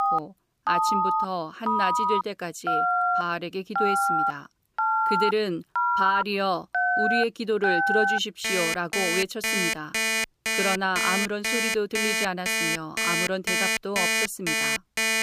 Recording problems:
alarms or sirens; very loud; throughout; 4 dB above the speech

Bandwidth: 15 kHz